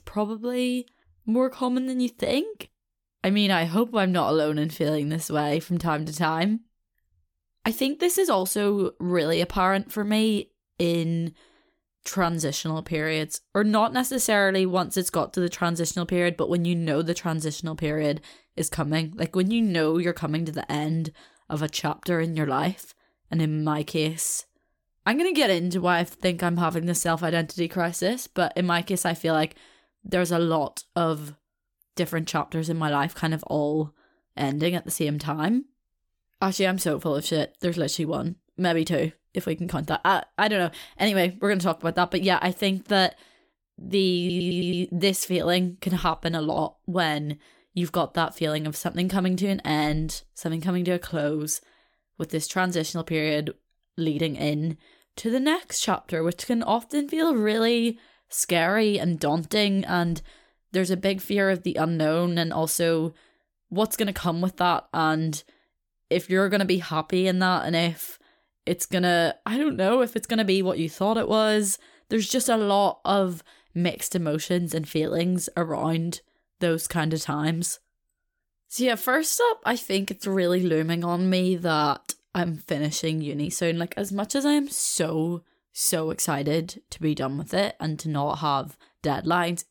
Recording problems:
audio stuttering; at 44 s

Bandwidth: 18 kHz